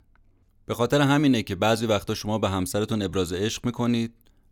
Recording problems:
none

